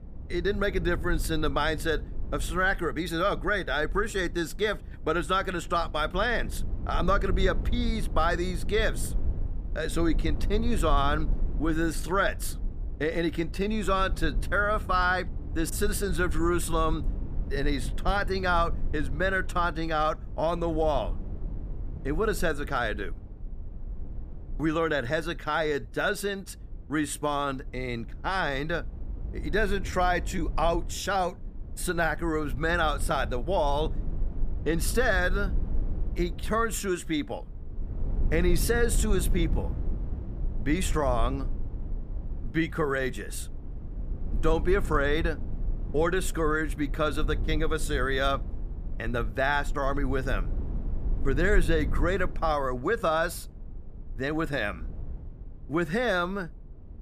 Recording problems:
low rumble; faint; throughout; 20 dB below the speech

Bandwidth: 14.5 kHz